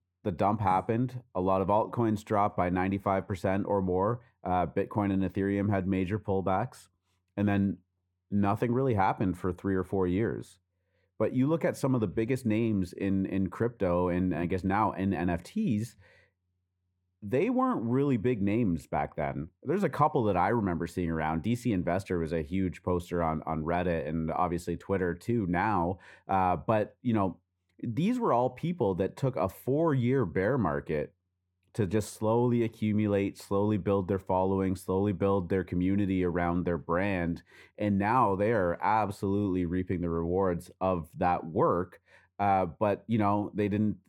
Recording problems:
muffled; very; fading above 2 kHz

